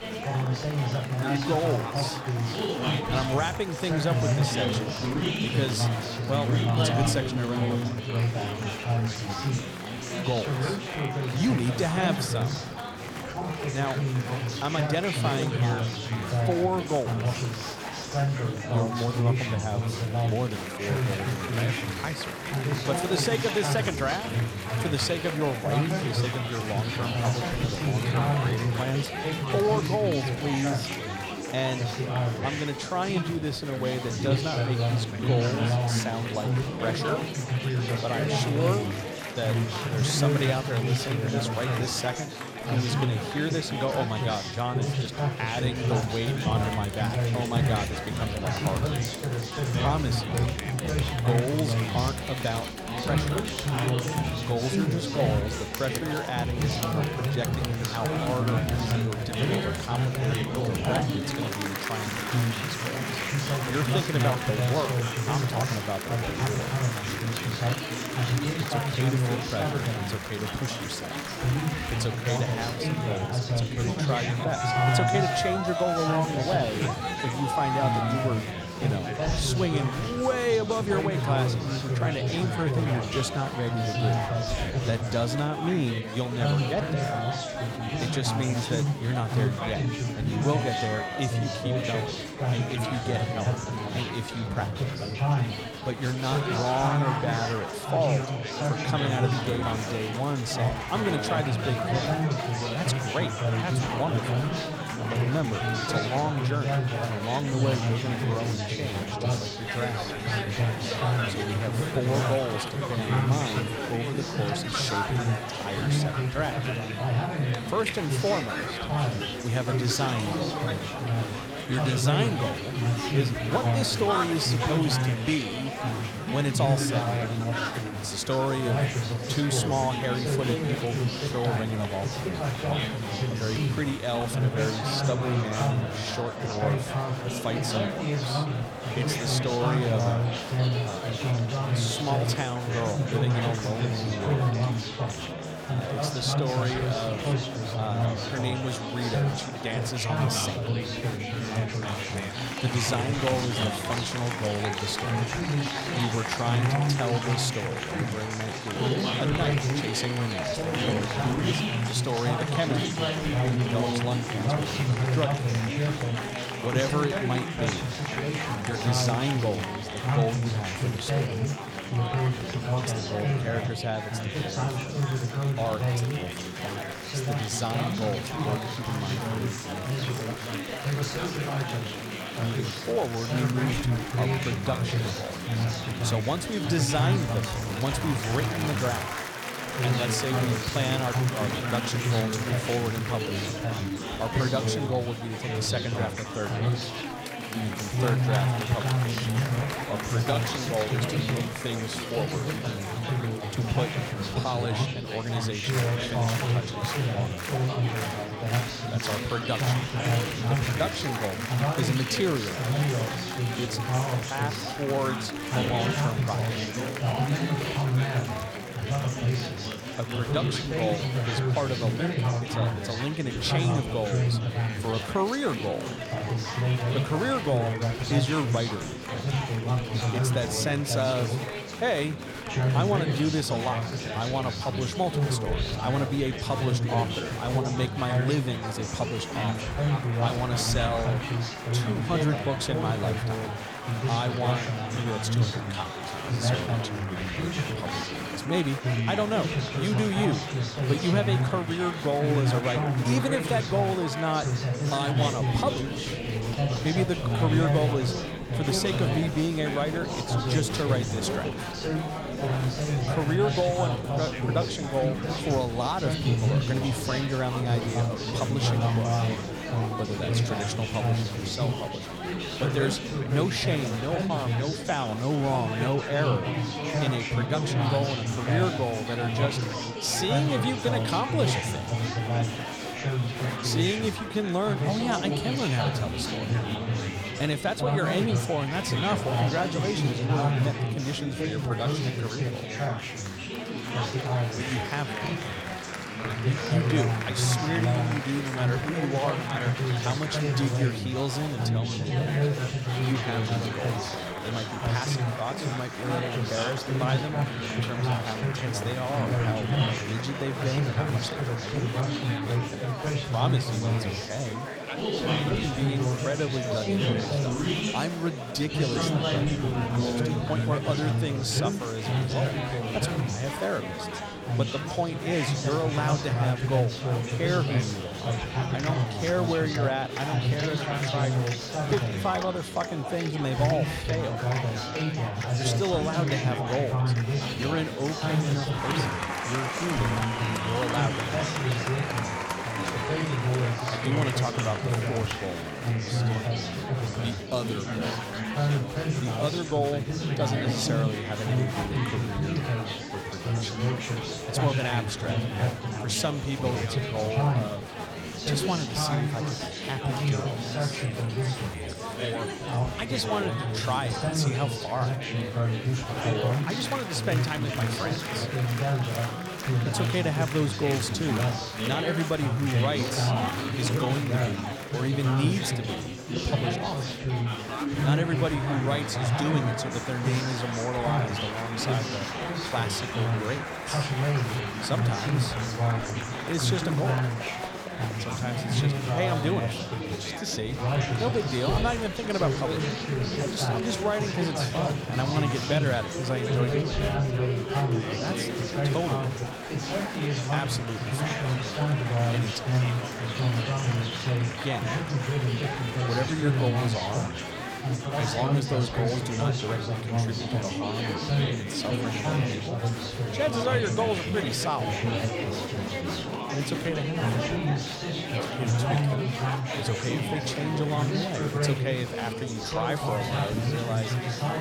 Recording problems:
chatter from many people; very loud; throughout; 2 dB above the speech

